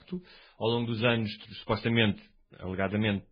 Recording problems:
garbled, watery; badly

